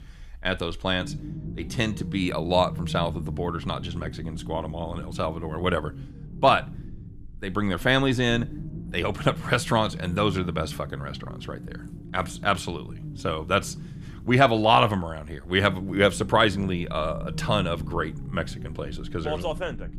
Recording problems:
low rumble; faint; throughout; 20 dB below the speech

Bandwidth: 14.5 kHz